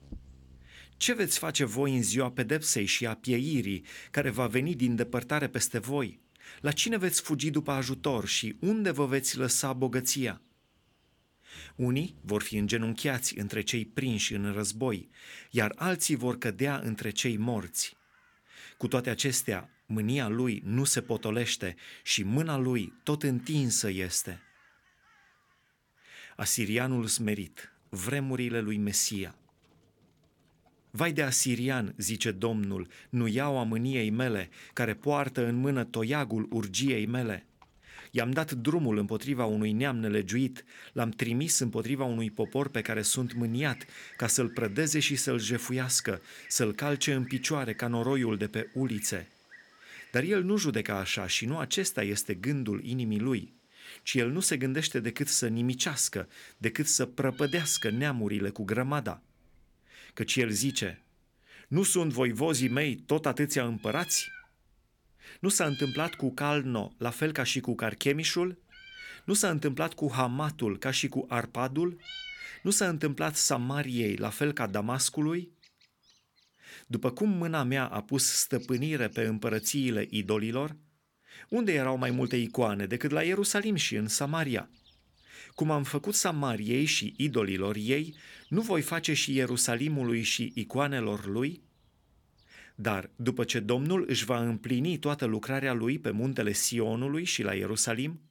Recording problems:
animal sounds; faint; throughout; 20 dB below the speech

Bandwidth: 18.5 kHz